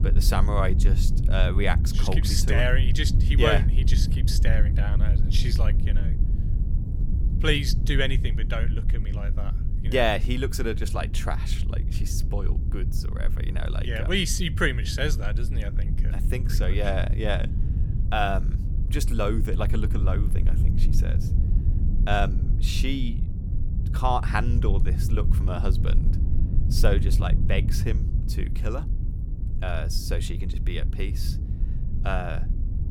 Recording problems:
low rumble; noticeable; throughout; 10 dB below the speech

